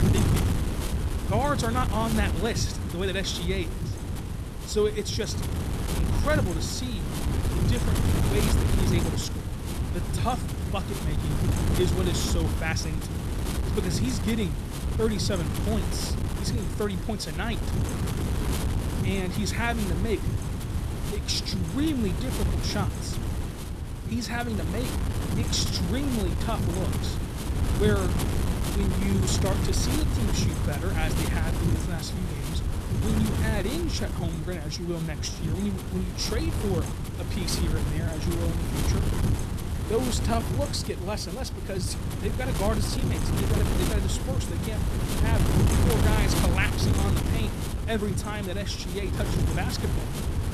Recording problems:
wind noise on the microphone; heavy; 3 dB below the speech

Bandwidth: 14.5 kHz